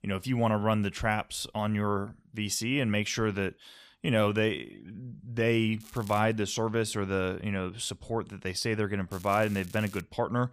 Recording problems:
crackling; noticeable; at 6 s and at 9 s; 20 dB below the speech

